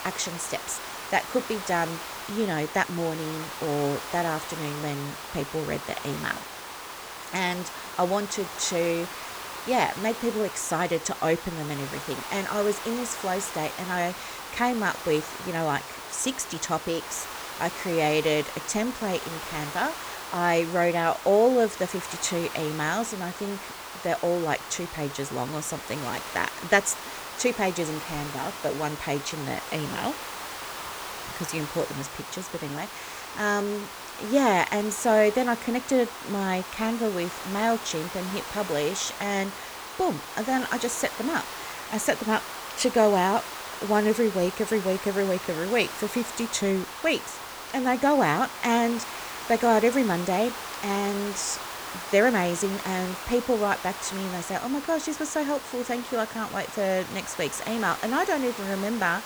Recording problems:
hiss; loud; throughout; 9 dB below the speech

